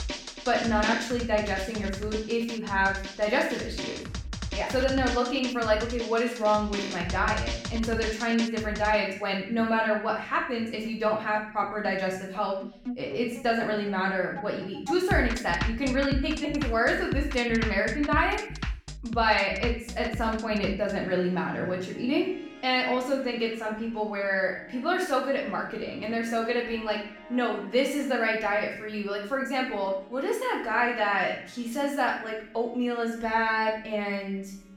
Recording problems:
off-mic speech; far
room echo; noticeable; dies away in 0.6 s
background music; loud; throughout; 9 dB below the speech

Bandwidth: 17.5 kHz